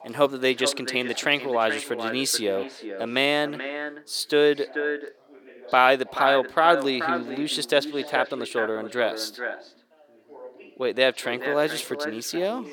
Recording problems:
echo of what is said; strong; throughout; 430 ms later, 8 dB below the speech
thin; somewhat; fading below 400 Hz
background chatter; faint; throughout; 3 voices, 25 dB below the speech

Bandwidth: 18.5 kHz